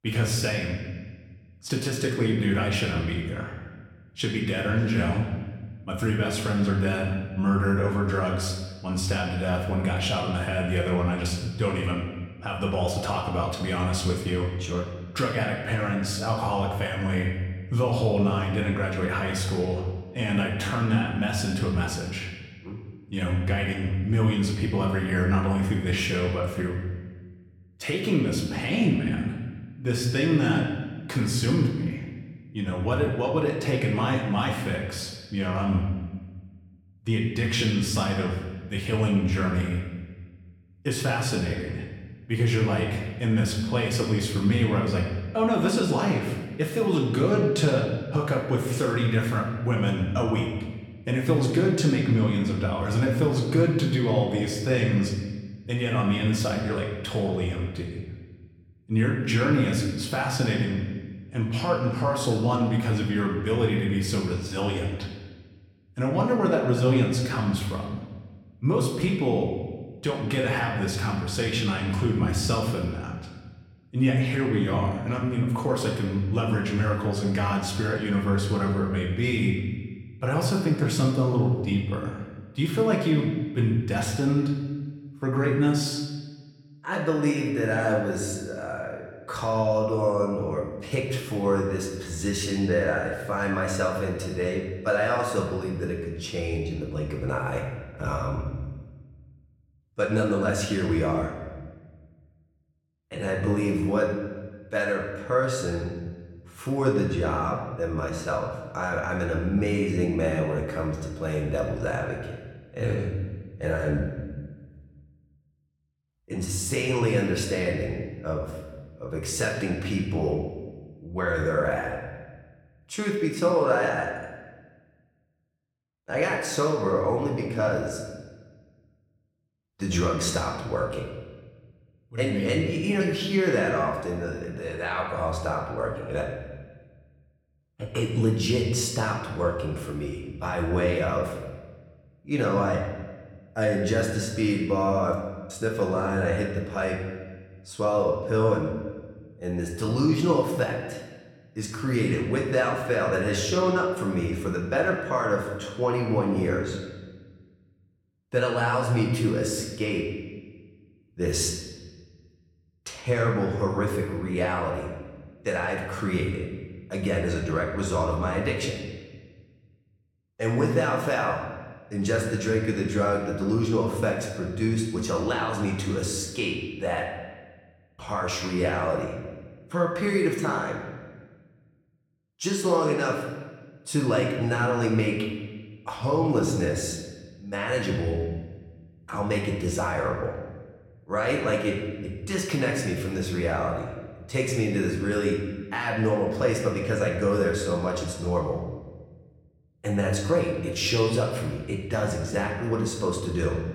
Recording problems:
room echo; noticeable; dies away in 1.2 s
off-mic speech; somewhat distant

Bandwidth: 17 kHz